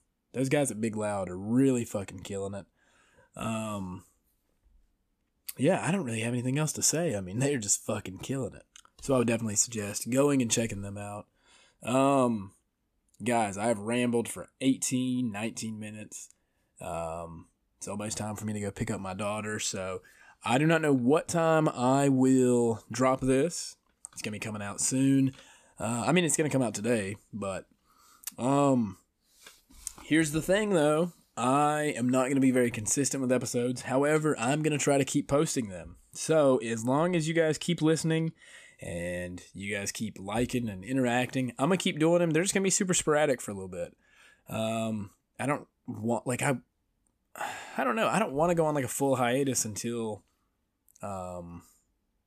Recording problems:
none

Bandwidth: 14.5 kHz